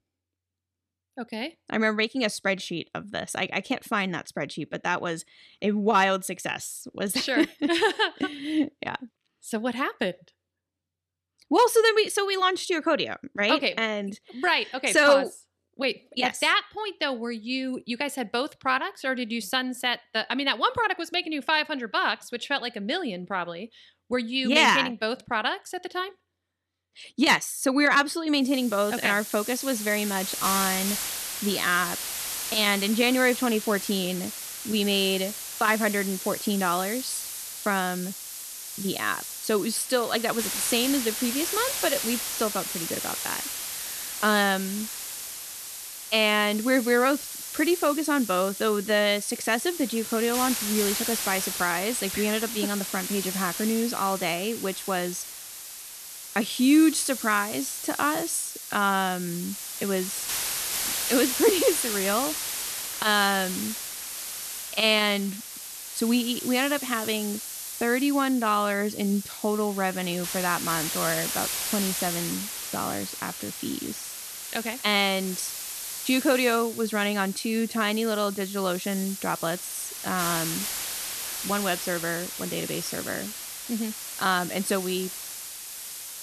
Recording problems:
hiss; loud; from 28 s on; 6 dB below the speech

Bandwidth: 13.5 kHz